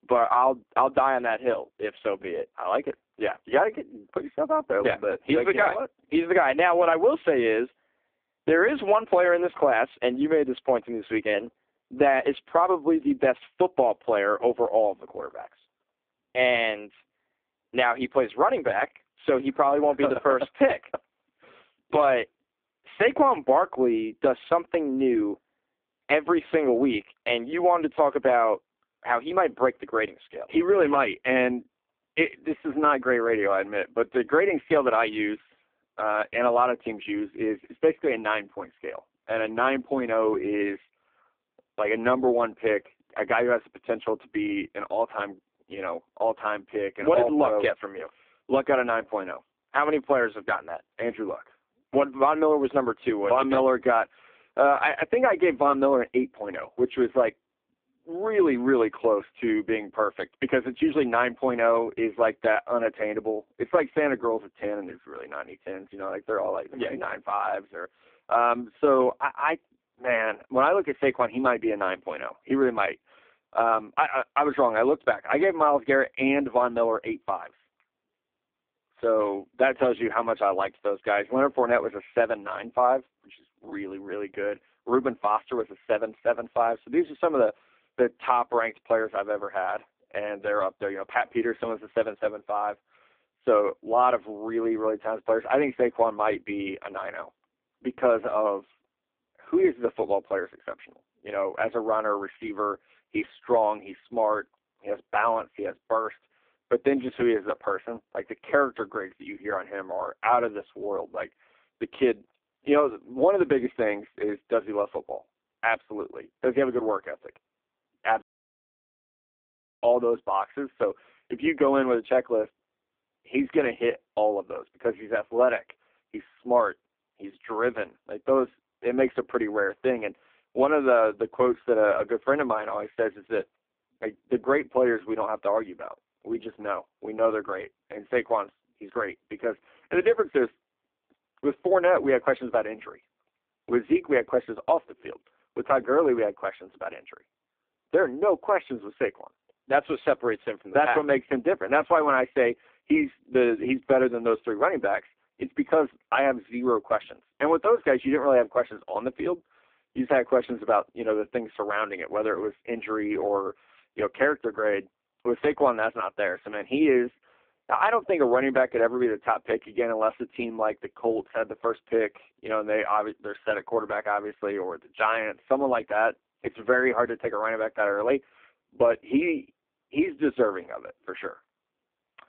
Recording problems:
phone-call audio; poor line
audio cutting out; at 1:58 for 1.5 s

